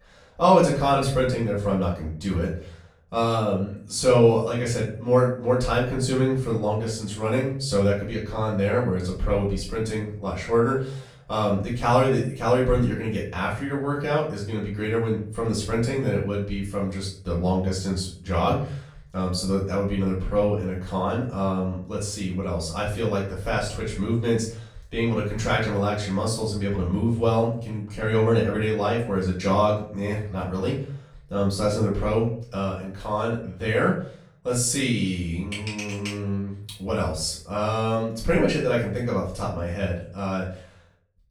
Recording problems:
off-mic speech; far
room echo; noticeable; dies away in 0.5 s

